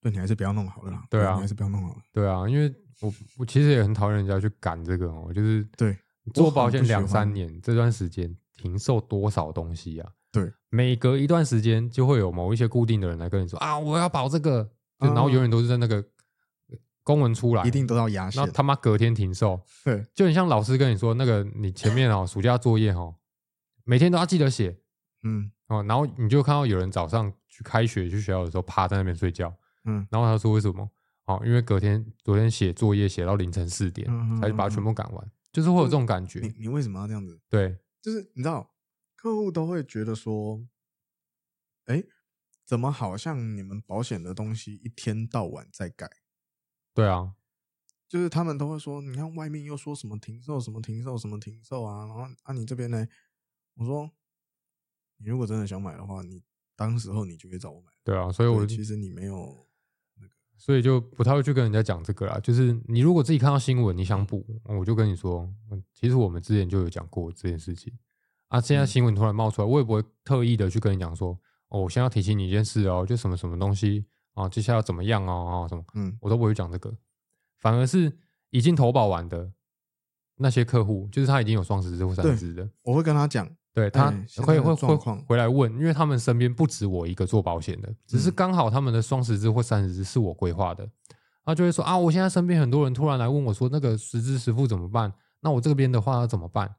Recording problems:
none

